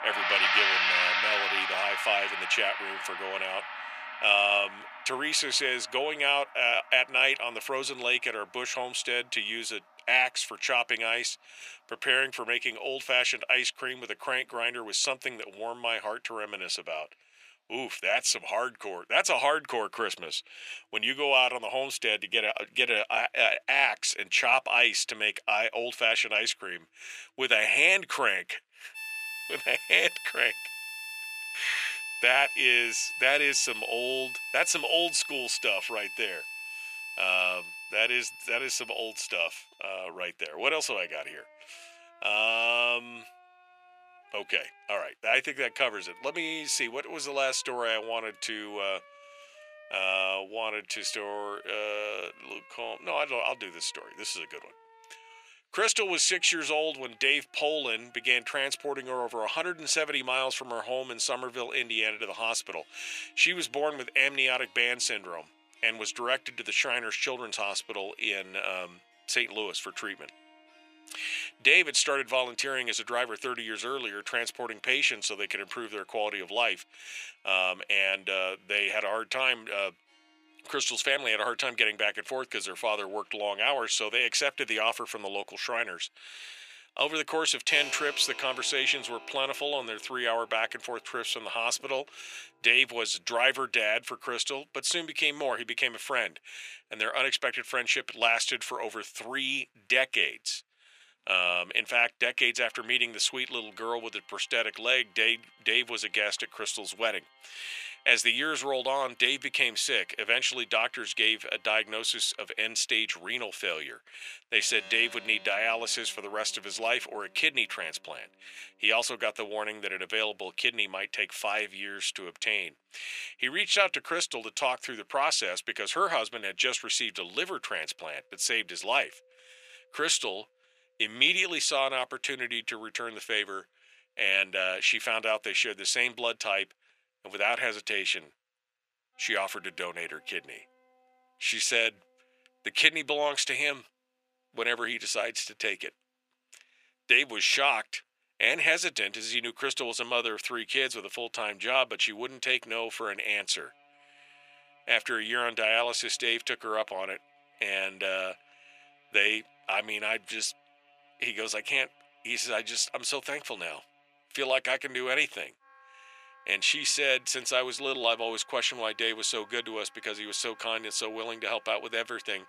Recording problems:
thin; very; fading below 700 Hz
background music; loud; throughout; 6 dB below the speech

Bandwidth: 14.5 kHz